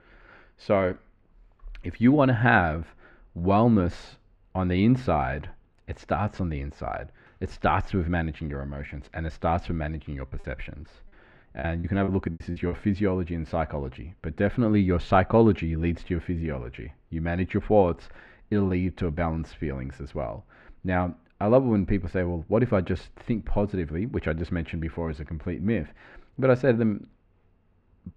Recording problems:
muffled; very; fading above 1.5 kHz
choppy; very; from 10 to 13 s; 10% of the speech affected

